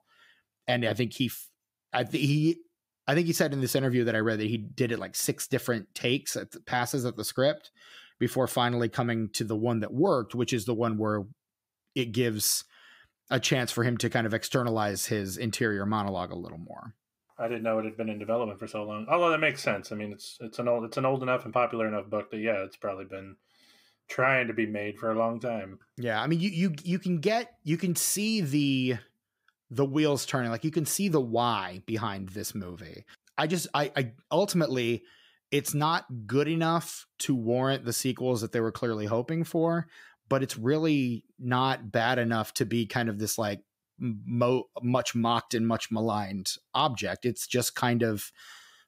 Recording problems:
none

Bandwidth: 15.5 kHz